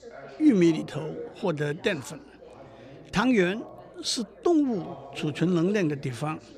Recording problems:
background chatter; noticeable; throughout; 3 voices, 20 dB below the speech

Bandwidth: 15 kHz